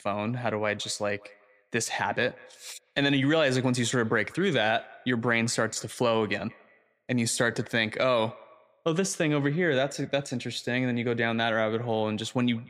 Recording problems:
echo of what is said; faint; throughout; 180 ms later, 25 dB below the speech

